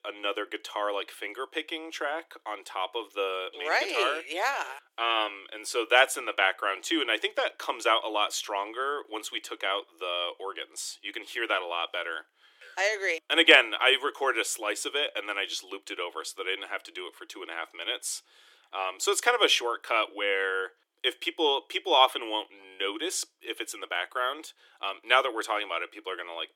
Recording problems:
thin; very; fading below 300 Hz

